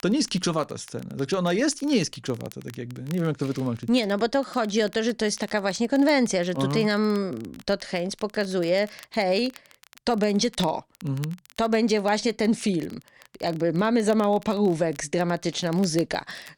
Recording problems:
crackle, like an old record; faint; 25 dB below the speech

